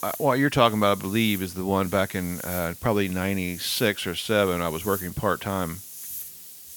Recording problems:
hiss; noticeable; throughout; 10 dB below the speech

